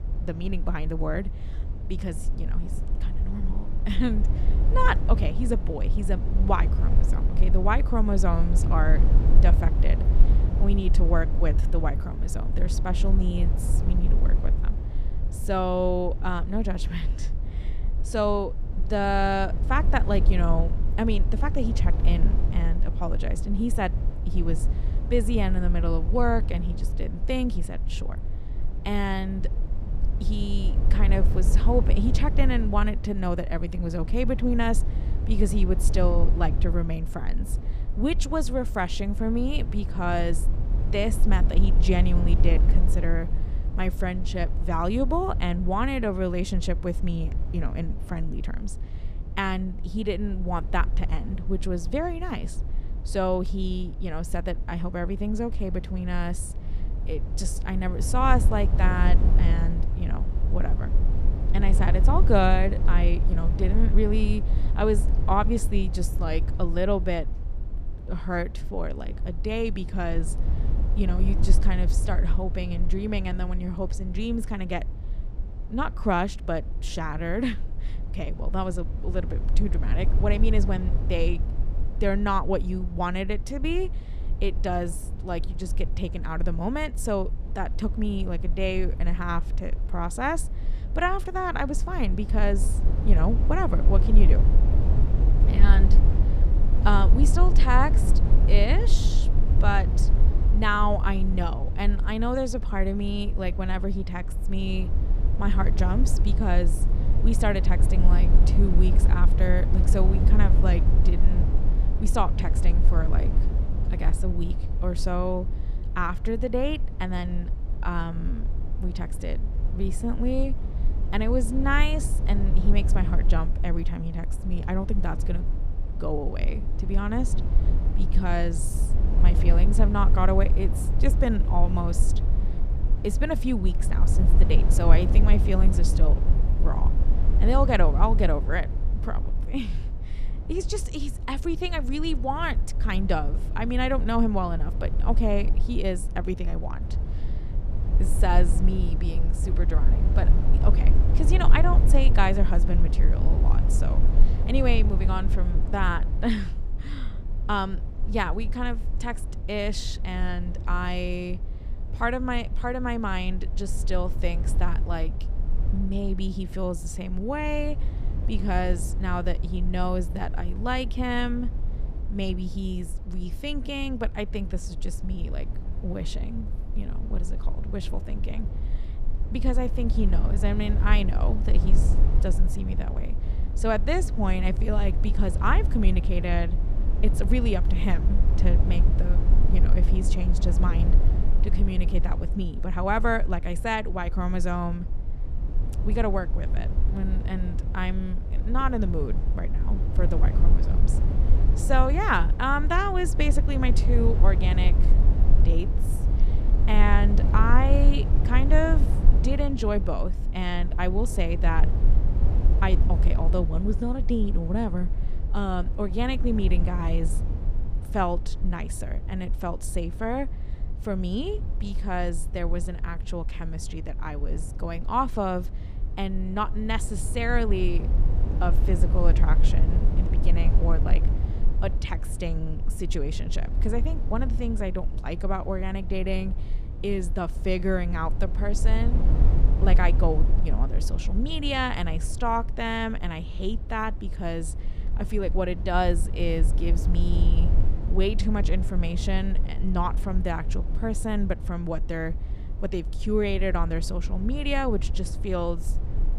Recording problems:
low rumble; noticeable; throughout; 10 dB below the speech

